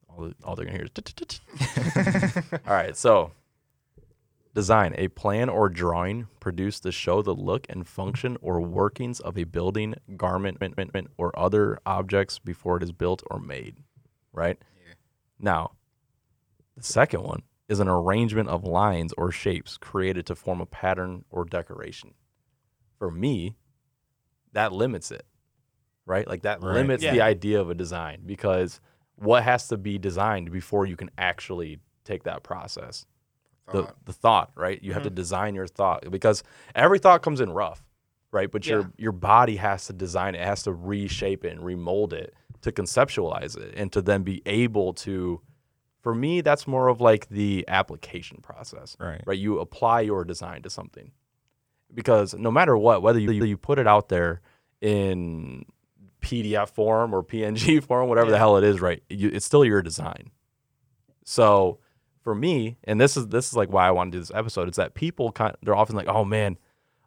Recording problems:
audio stuttering; at 2 s, at 10 s and at 53 s

